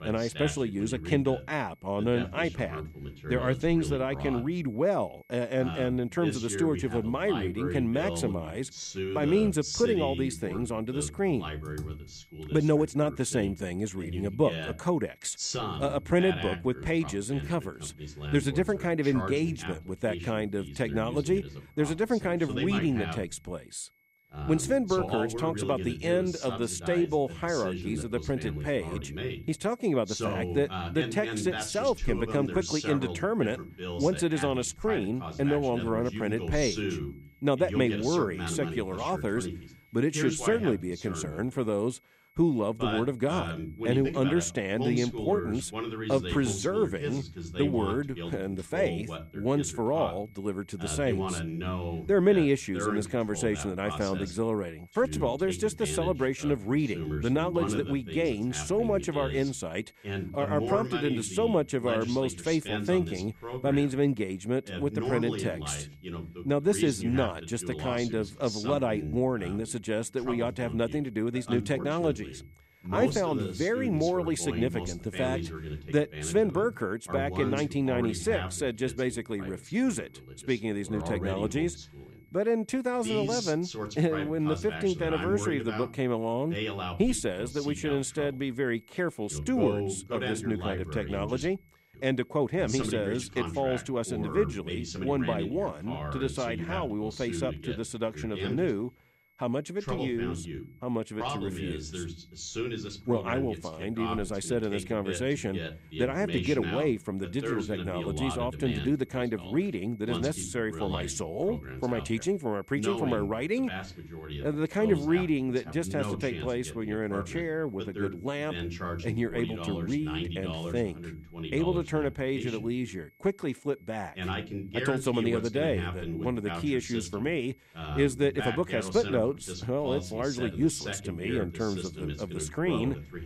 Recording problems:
voice in the background; loud; throughout; 7 dB below the speech
high-pitched whine; faint; throughout; 2 kHz, 35 dB below the speech
keyboard typing; faint; at 12 s; peak 15 dB below the speech

